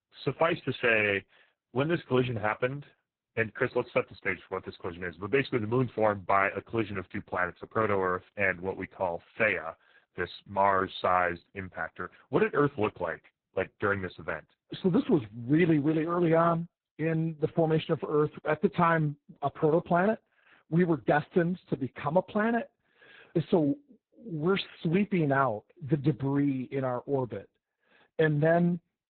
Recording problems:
garbled, watery; badly; nothing above 4 kHz

